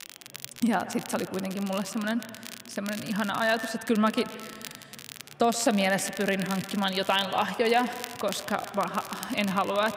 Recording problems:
echo of what is said; noticeable; throughout; 130 ms later, 15 dB below the speech
crackle, like an old record; noticeable; 15 dB below the speech
murmuring crowd; faint; throughout; 25 dB below the speech

